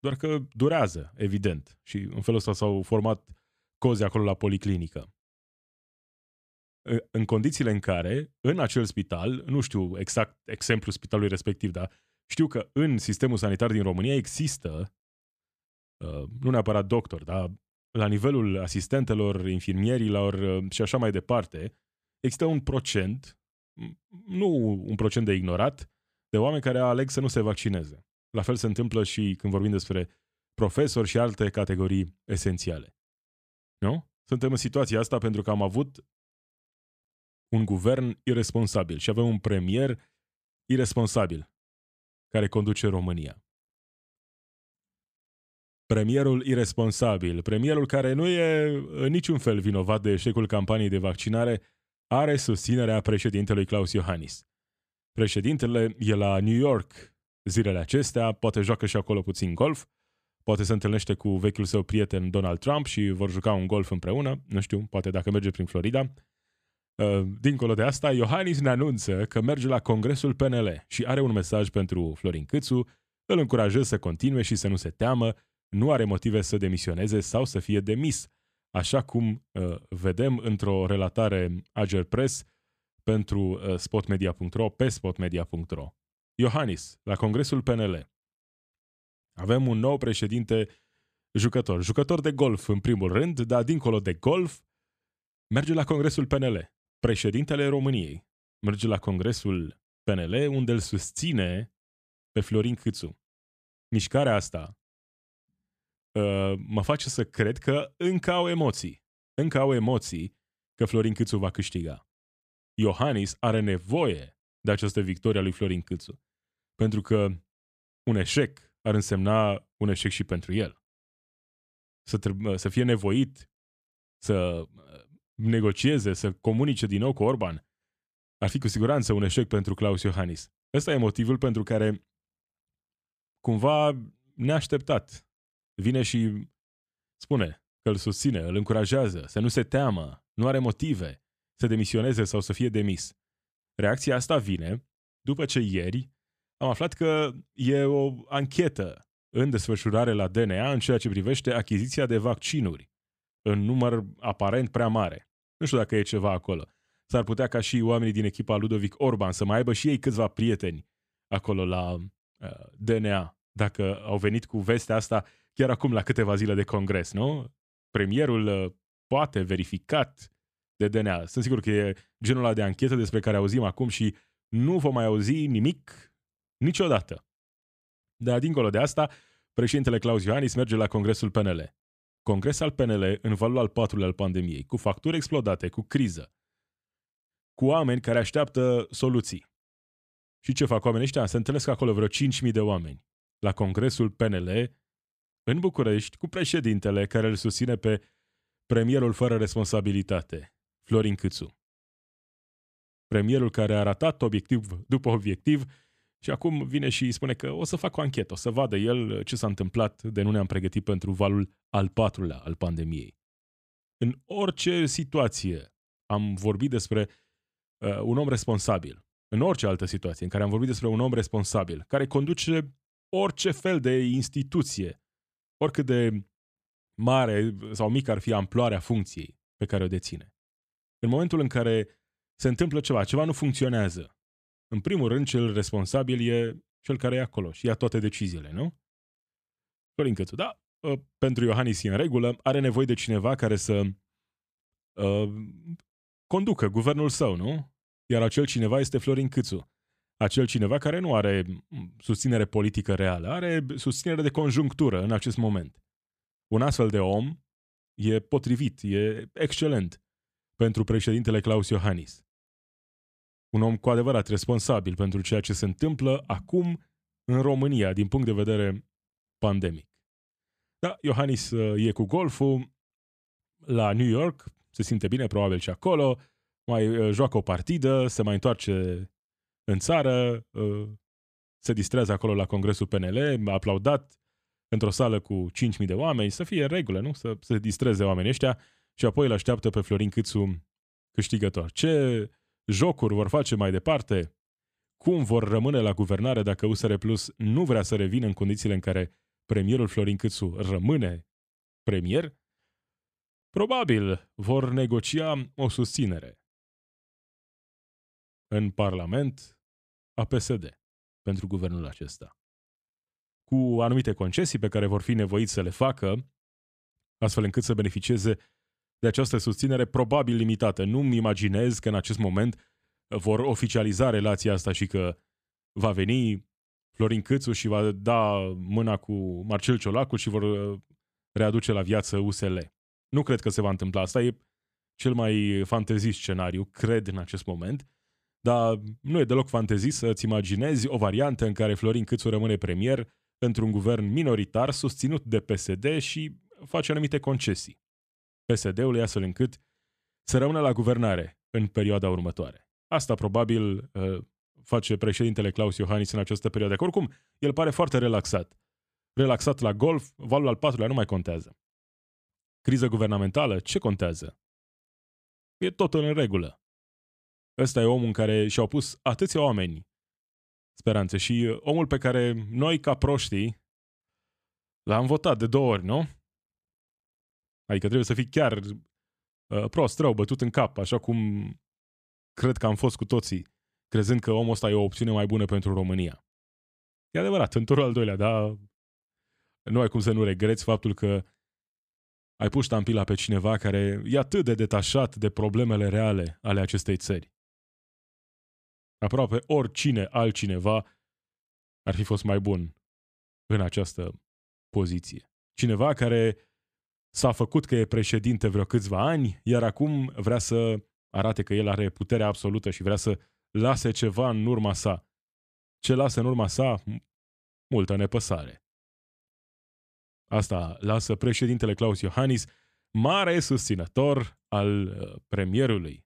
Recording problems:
none

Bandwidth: 14.5 kHz